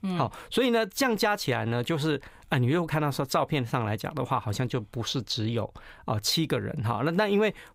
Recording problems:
none

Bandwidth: 15.5 kHz